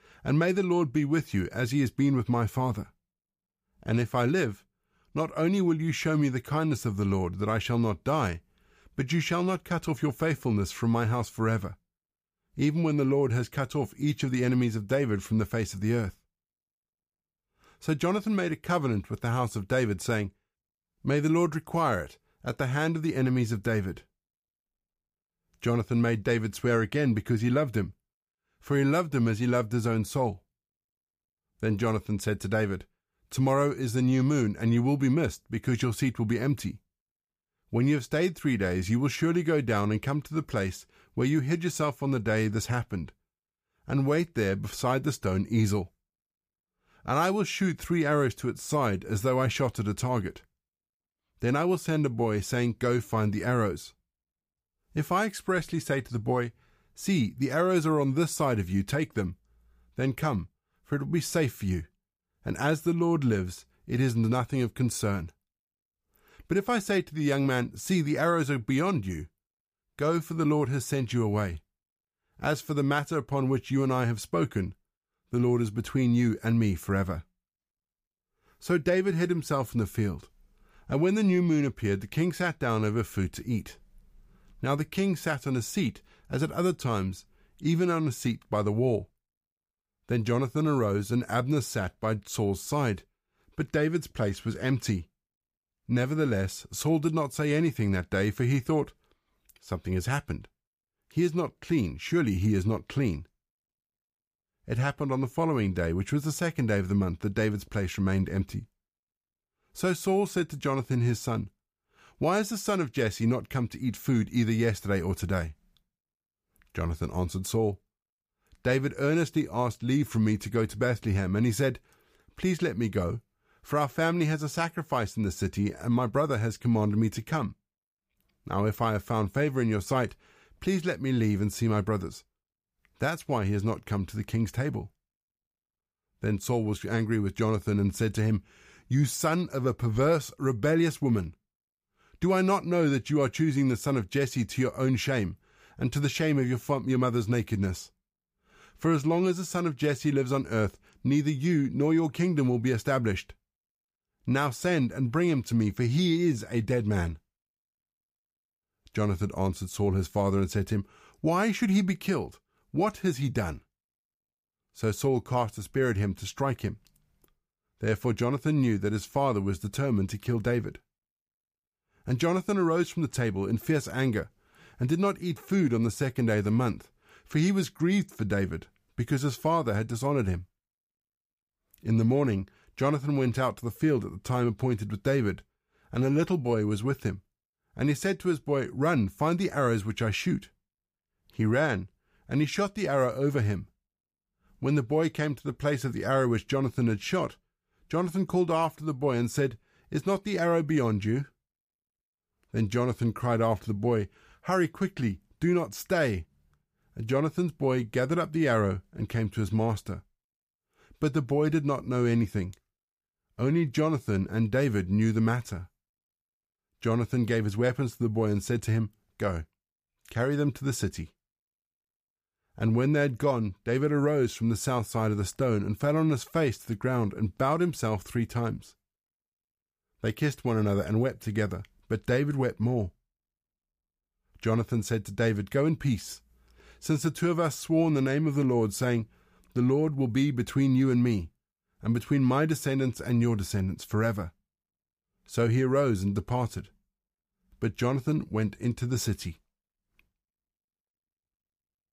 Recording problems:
none

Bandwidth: 15 kHz